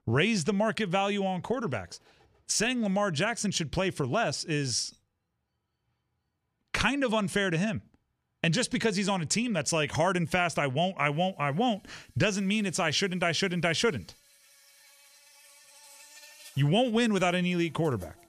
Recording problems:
animal sounds; faint; throughout; 25 dB below the speech

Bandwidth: 14.5 kHz